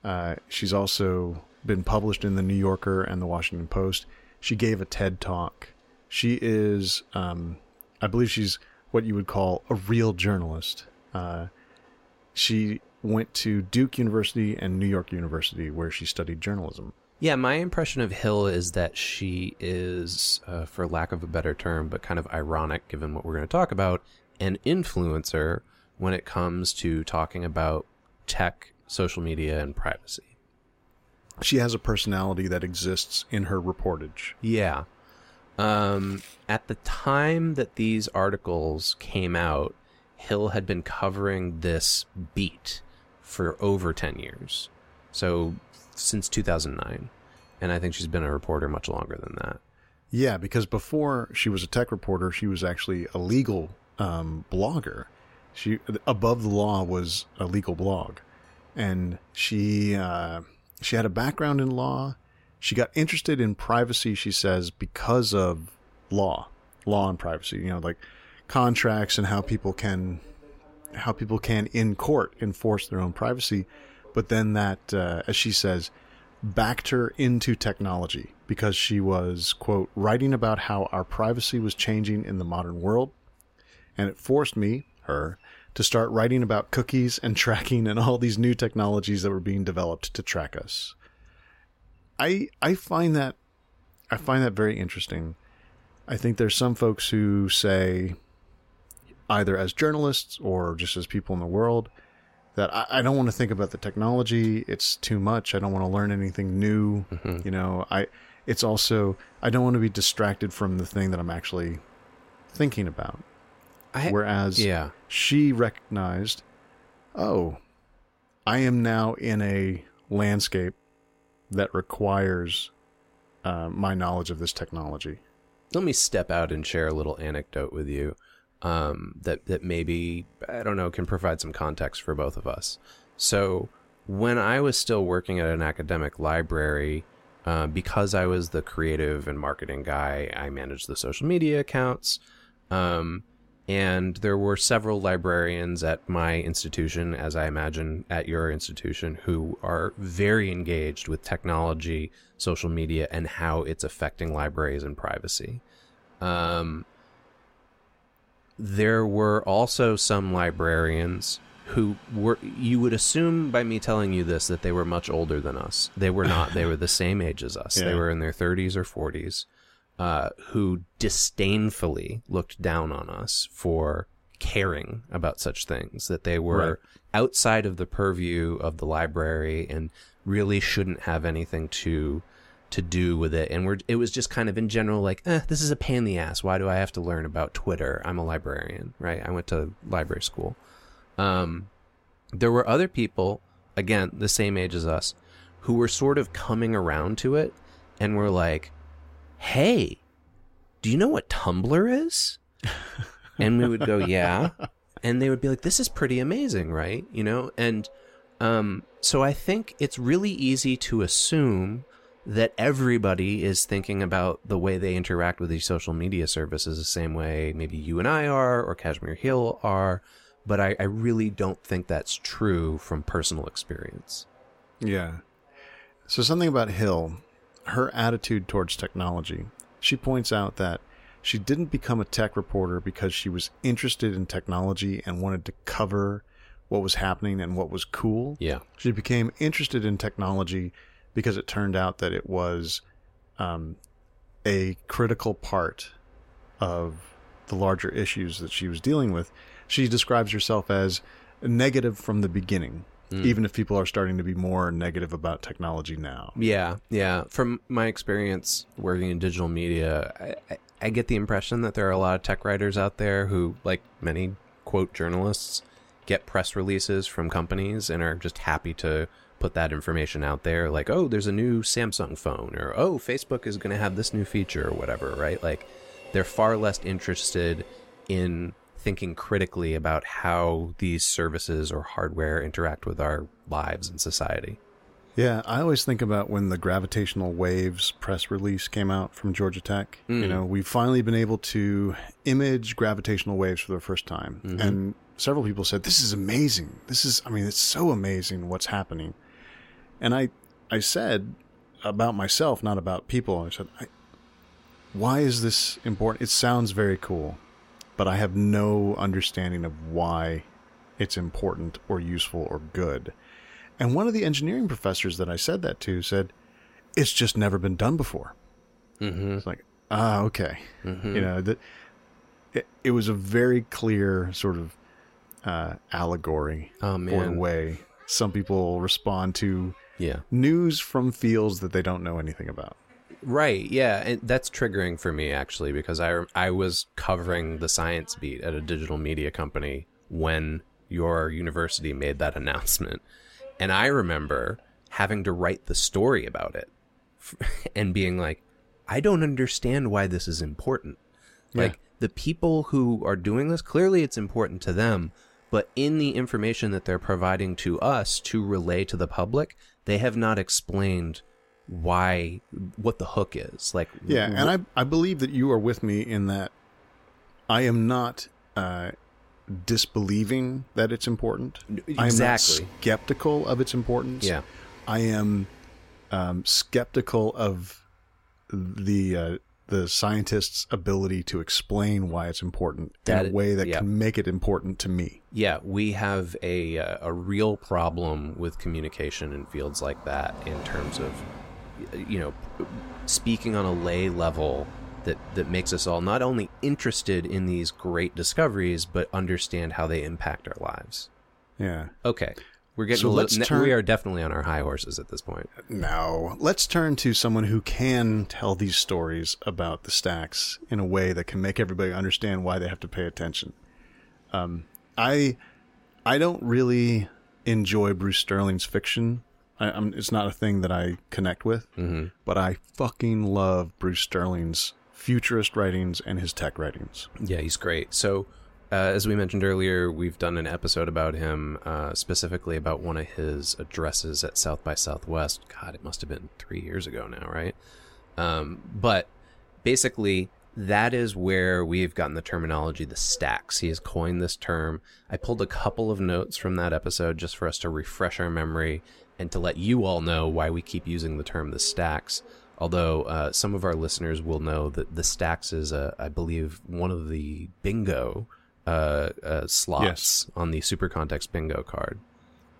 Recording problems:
train or aircraft noise; faint; throughout; 30 dB below the speech

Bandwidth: 16 kHz